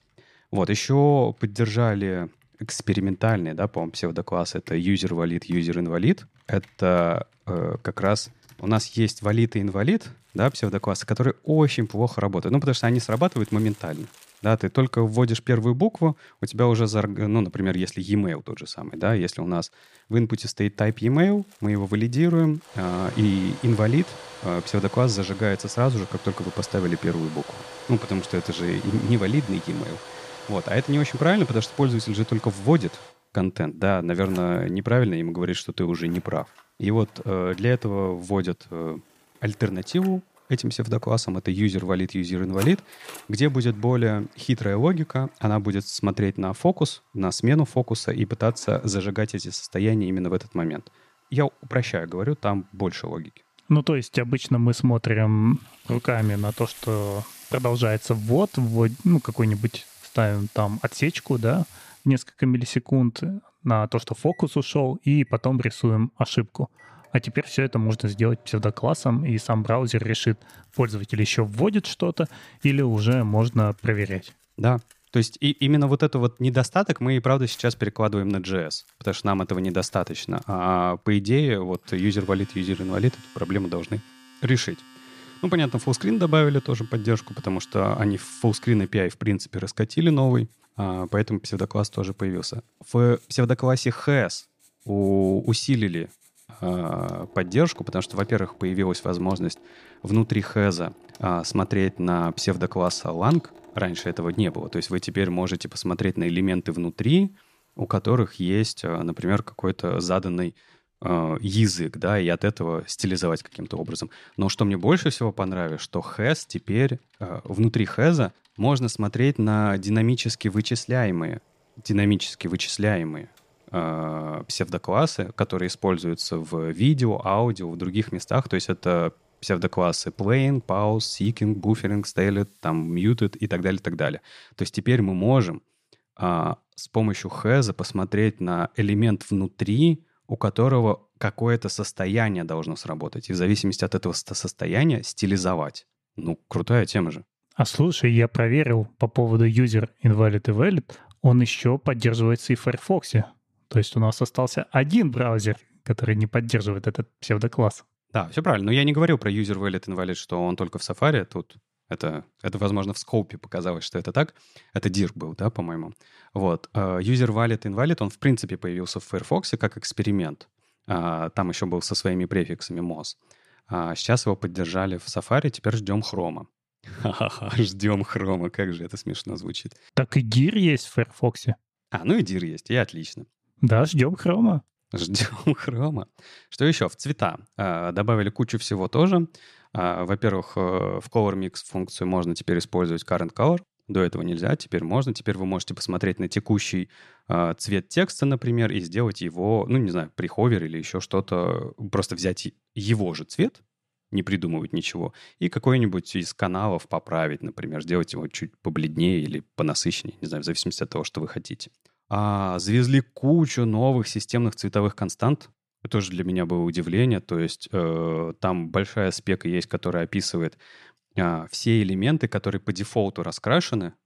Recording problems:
household noises; faint; until 2:14; 20 dB below the speech

